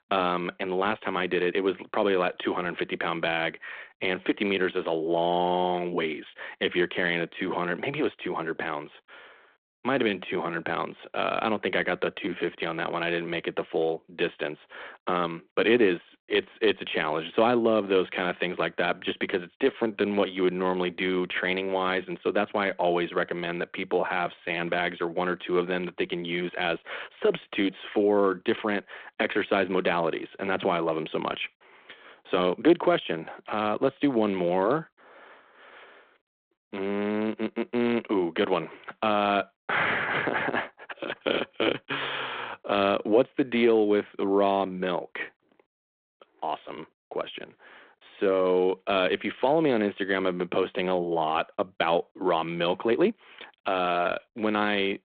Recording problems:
phone-call audio
uneven, jittery; strongly; from 0.5 to 54 s

